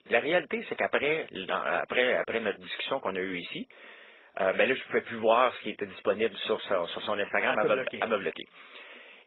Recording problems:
garbled, watery; badly; nothing above 4 kHz
thin; somewhat; fading below 450 Hz

